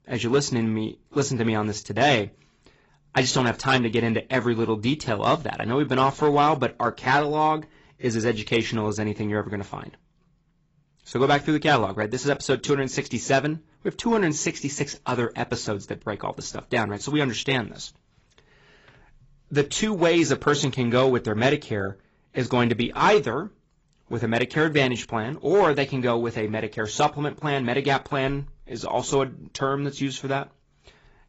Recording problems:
garbled, watery; badly; nothing above 7.5 kHz

